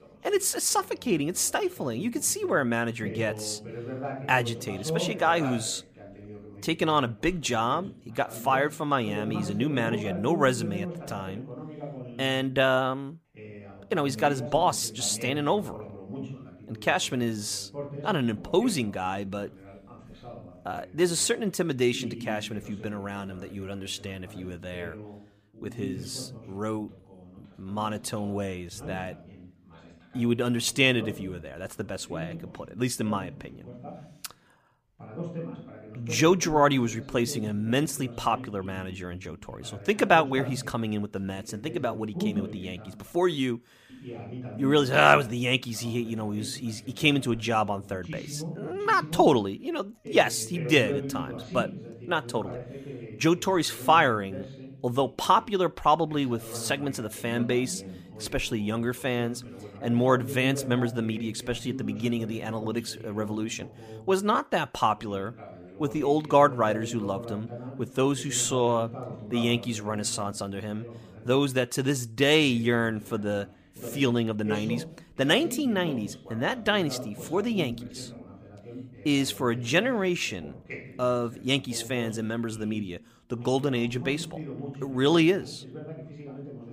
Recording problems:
voice in the background; noticeable; throughout; 15 dB below the speech

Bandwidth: 15 kHz